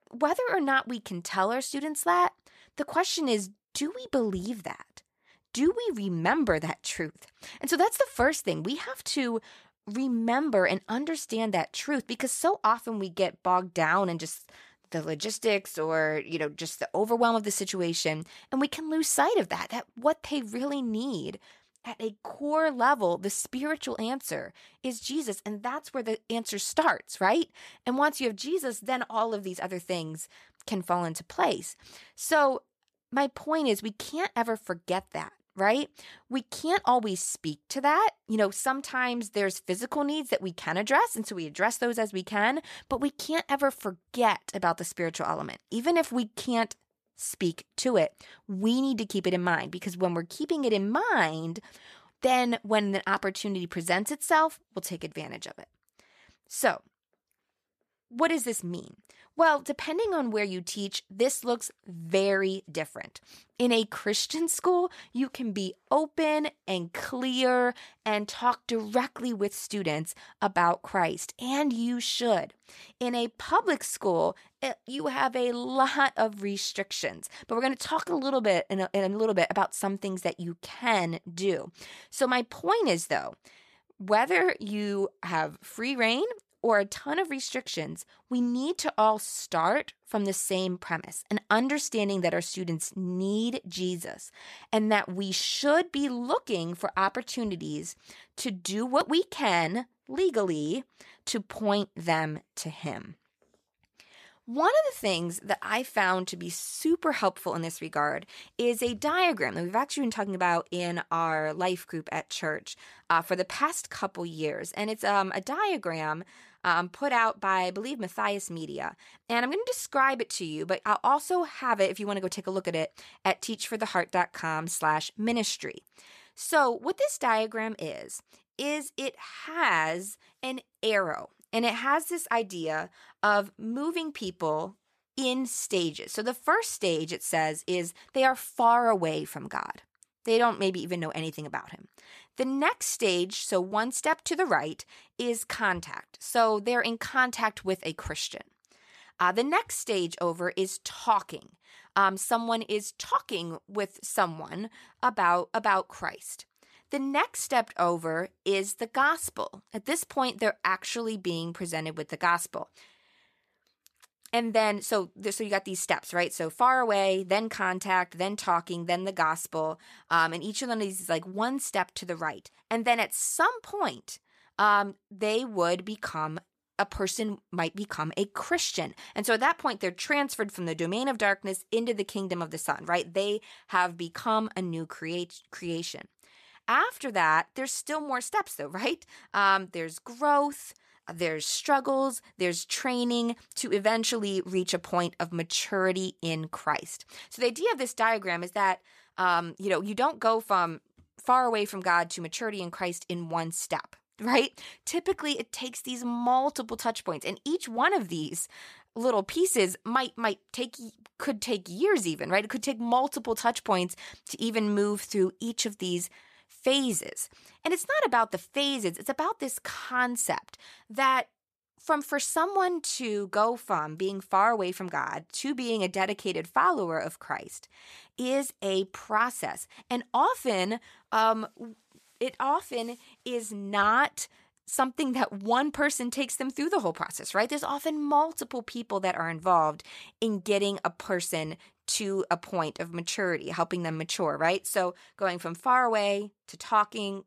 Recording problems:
none

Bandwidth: 14.5 kHz